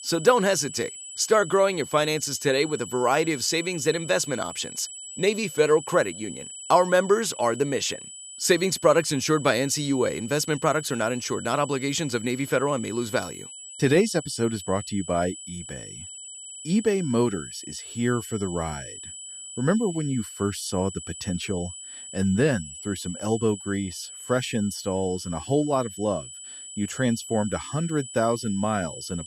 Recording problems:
high-pitched whine; noticeable; throughout; 8 kHz, 10 dB below the speech

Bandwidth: 14 kHz